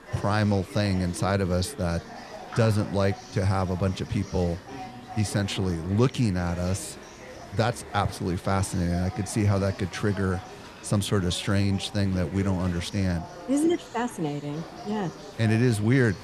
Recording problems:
chatter from many people; noticeable; throughout; 15 dB below the speech
hiss; faint; throughout; 25 dB below the speech

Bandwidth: 13.5 kHz